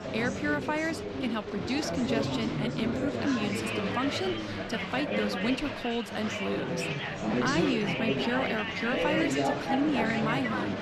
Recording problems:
chatter from many people; very loud; throughout; 1 dB above the speech

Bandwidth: 13.5 kHz